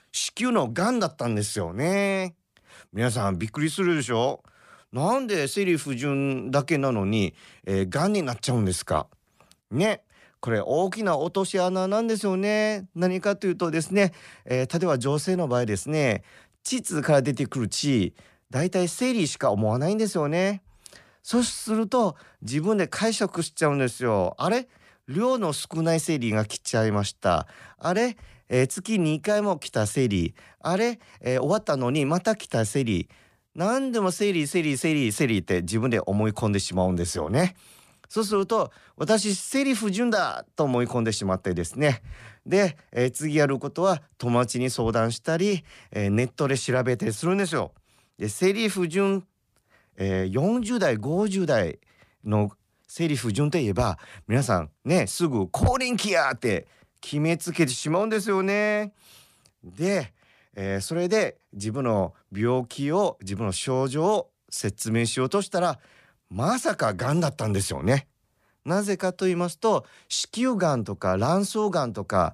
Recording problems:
none

